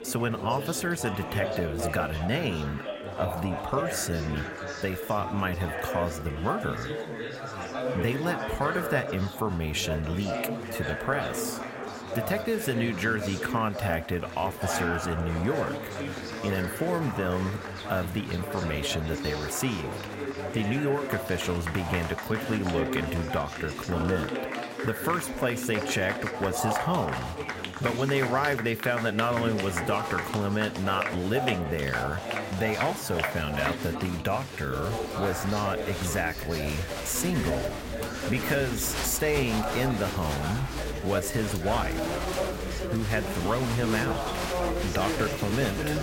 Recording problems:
chatter from many people; loud; throughout; 3 dB below the speech

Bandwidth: 16 kHz